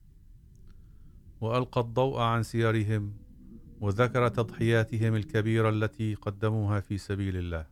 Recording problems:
low rumble; faint; throughout; 25 dB below the speech

